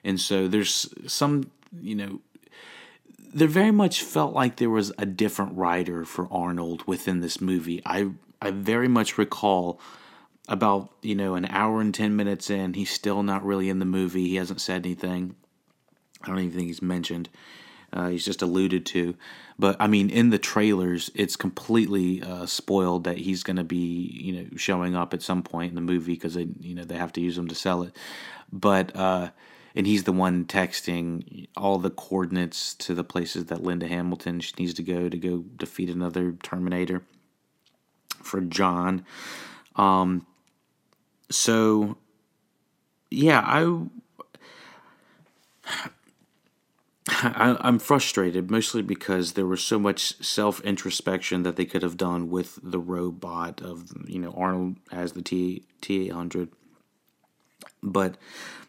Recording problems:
none

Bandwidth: 16 kHz